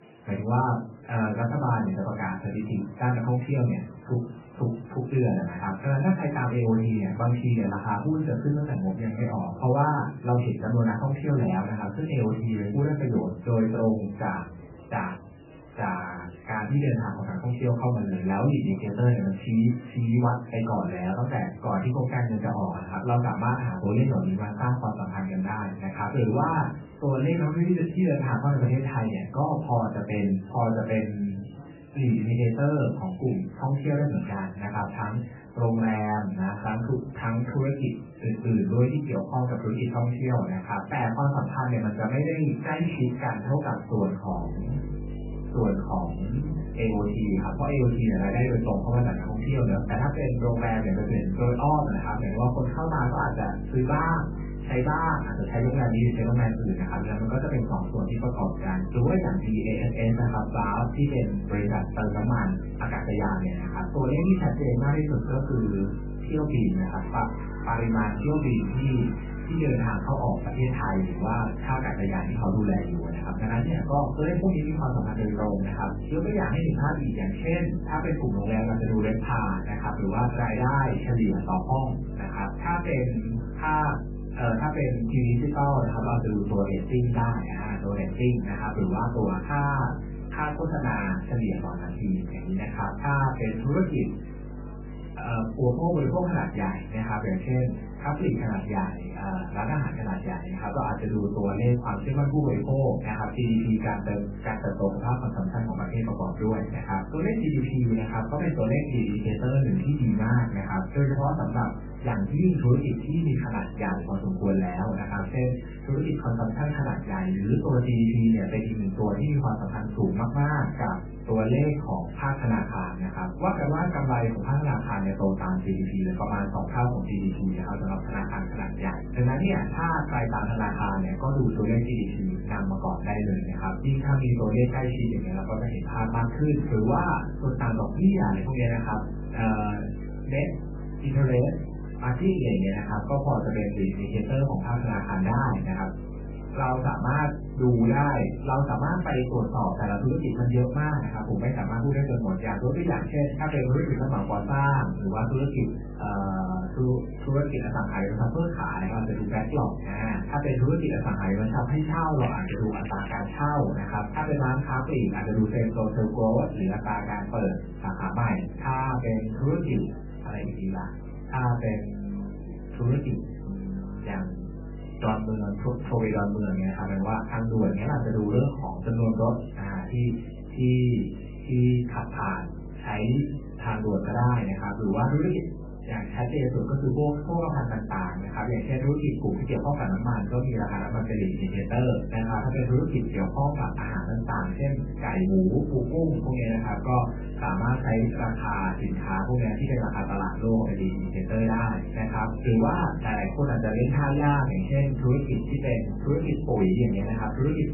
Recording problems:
off-mic speech; far
garbled, watery; badly; nothing above 2.5 kHz
room echo; slight; dies away in 0.3 s
electrical hum; noticeable; from 44 s on; 50 Hz, 15 dB below the speech
crackling; noticeable; at 2:33 and at 2:42; 15 dB below the speech
murmuring crowd; faint; throughout; 20 dB below the speech

